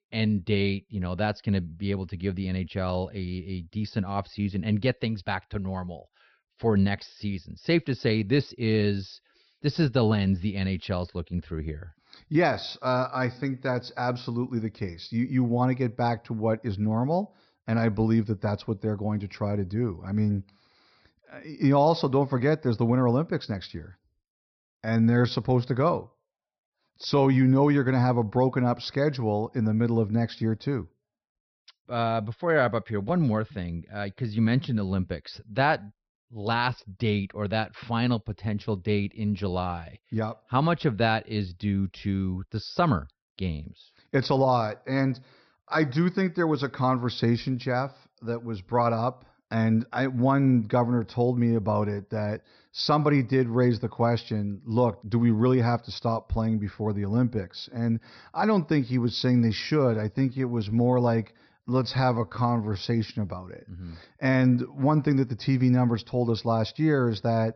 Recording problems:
high frequencies cut off; noticeable; nothing above 5.5 kHz
uneven, jittery; strongly; from 25 s to 1:03

